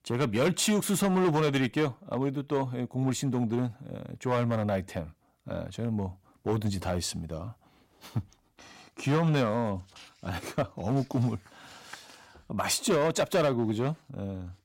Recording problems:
distortion; slight; 5% of the sound clipped

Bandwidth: 16 kHz